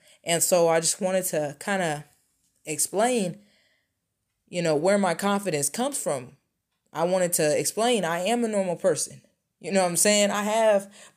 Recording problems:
none

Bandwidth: 15 kHz